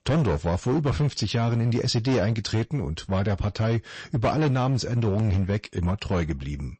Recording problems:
distortion; slight; 15% of the sound clipped
garbled, watery; slightly; nothing above 8 kHz

